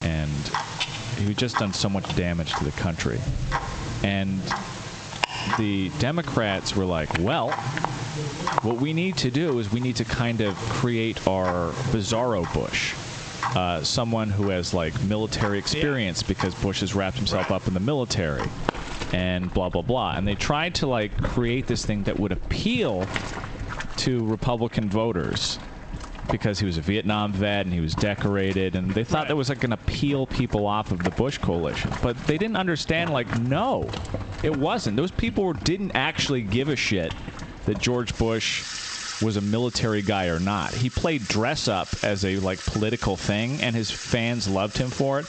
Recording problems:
squashed, flat; heavily, background pumping
garbled, watery; slightly; nothing above 8 kHz
household noises; loud; throughout; 9 dB below the speech

